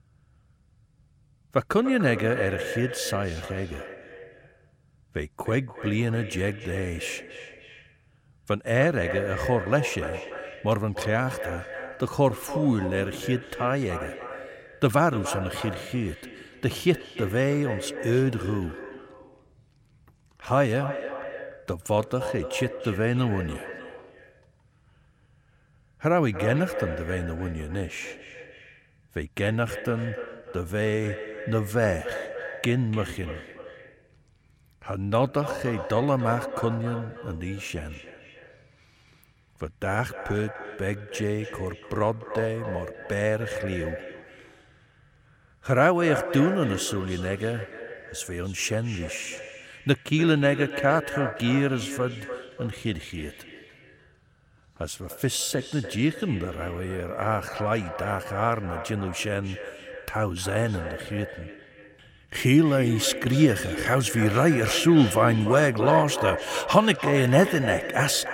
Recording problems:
echo of what is said; strong; throughout; 290 ms later, 10 dB below the speech

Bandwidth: 16.5 kHz